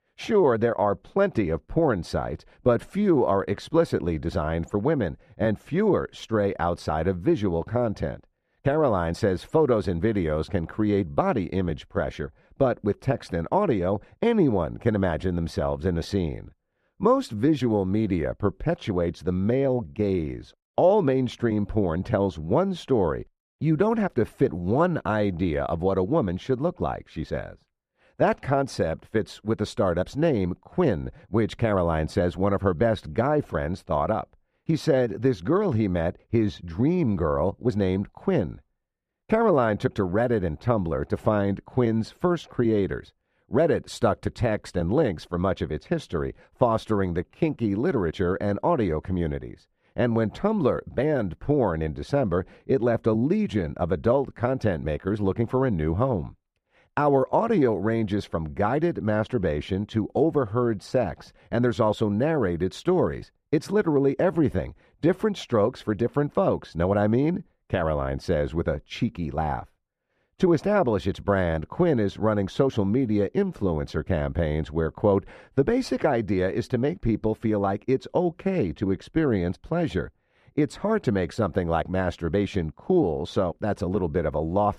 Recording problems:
muffled; slightly; fading above 1.5 kHz

